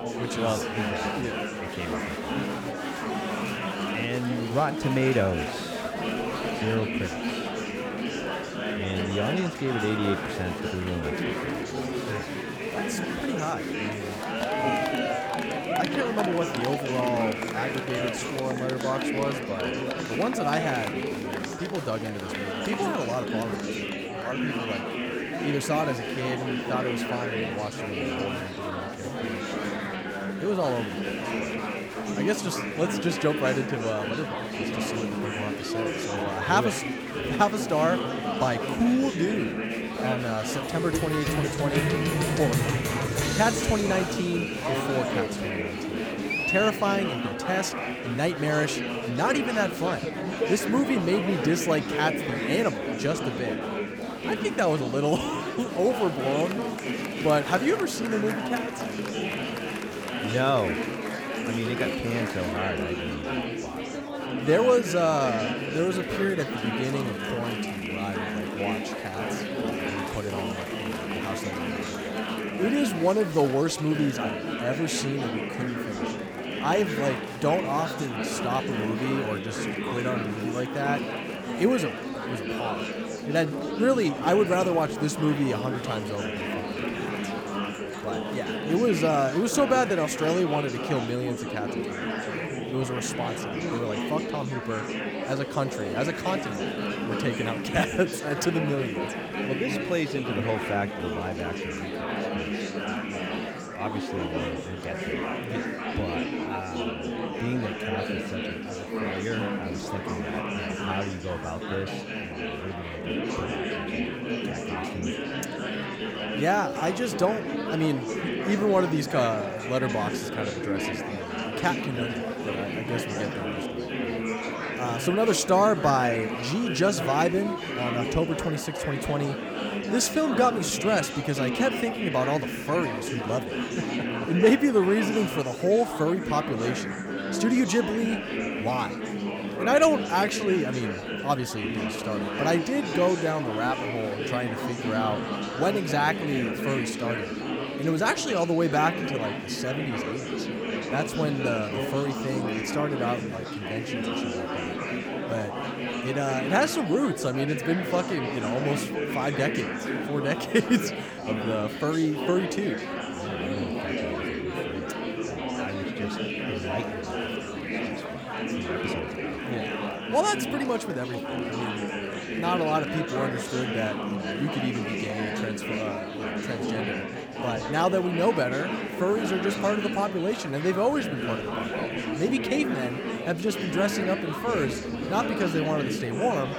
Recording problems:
murmuring crowd; loud; throughout; 2 dB below the speech

